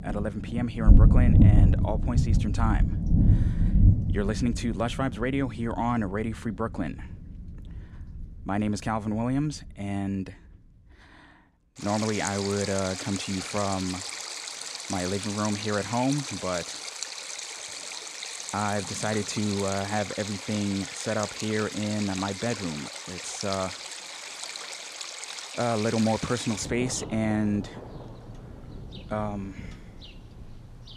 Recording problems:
rain or running water; very loud; throughout; 1 dB above the speech

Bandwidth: 14.5 kHz